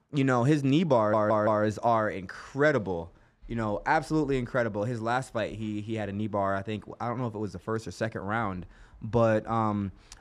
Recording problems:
audio stuttering; at 1 s

